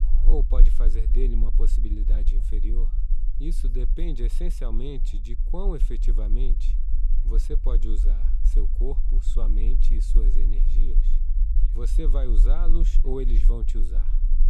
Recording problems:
low rumble; noticeable; throughout; 10 dB below the speech

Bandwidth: 14.5 kHz